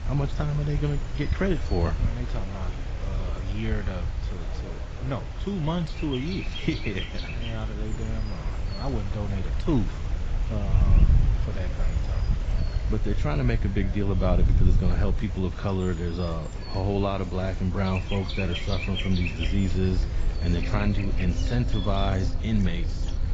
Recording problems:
garbled, watery; badly; nothing above 7.5 kHz
animal sounds; loud; throughout; 8 dB below the speech
rain or running water; noticeable; throughout; 20 dB below the speech
murmuring crowd; noticeable; throughout; 20 dB below the speech
wind noise on the microphone; occasional gusts; 15 dB below the speech

